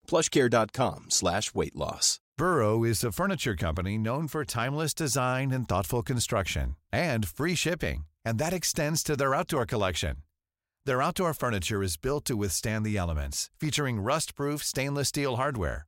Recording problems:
none

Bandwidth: 16 kHz